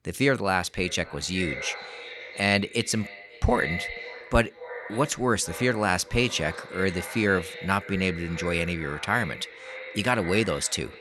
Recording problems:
echo of what is said; strong; throughout; 540 ms later, 10 dB below the speech

